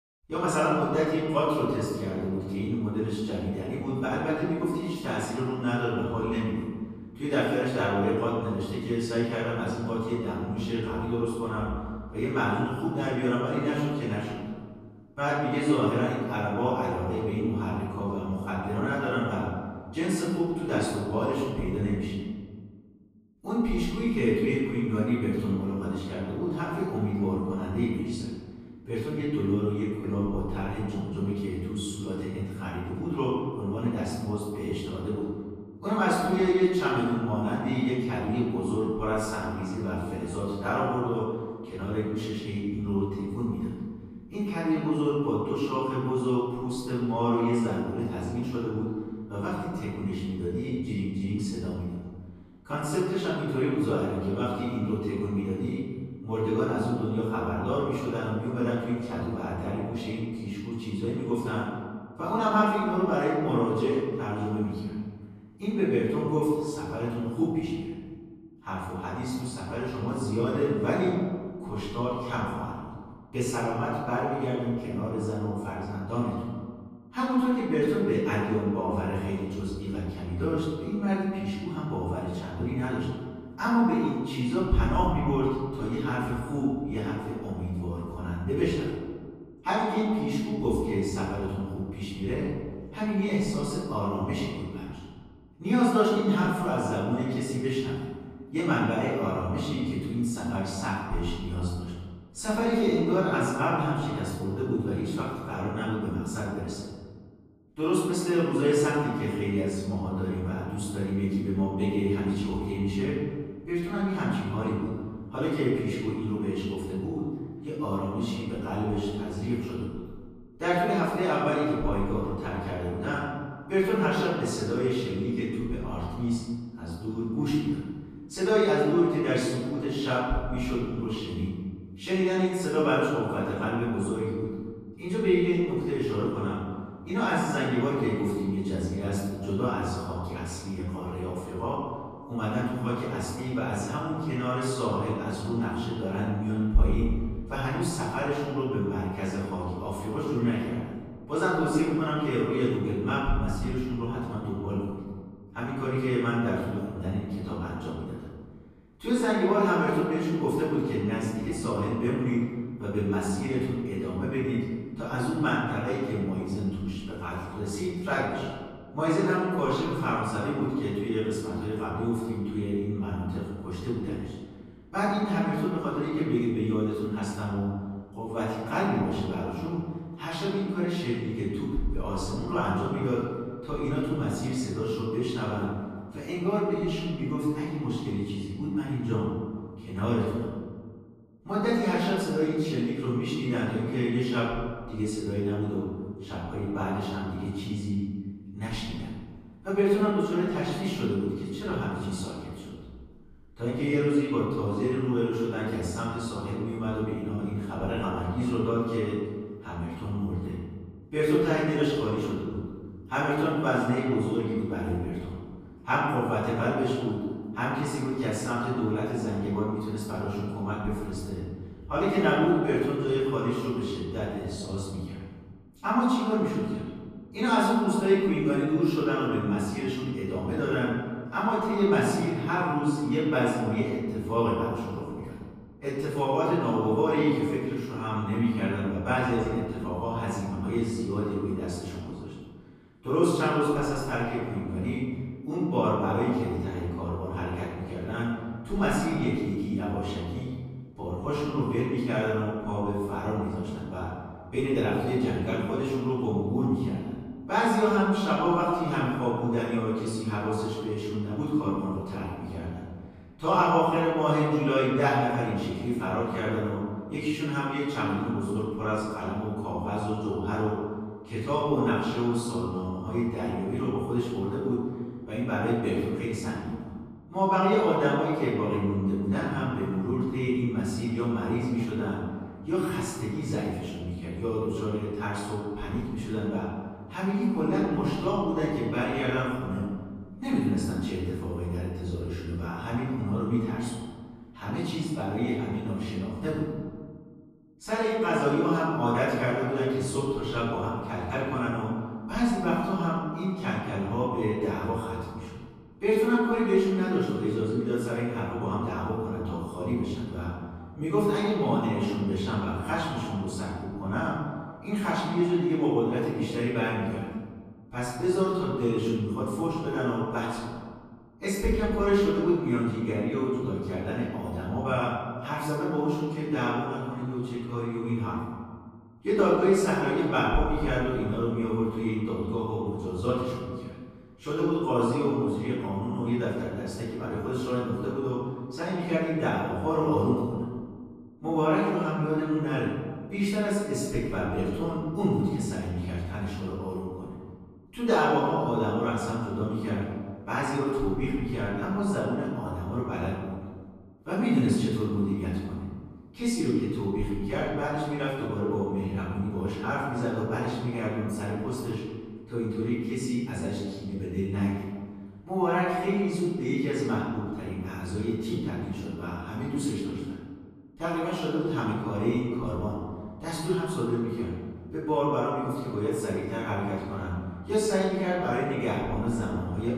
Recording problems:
room echo; strong; dies away in 1.7 s
off-mic speech; far

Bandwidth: 14.5 kHz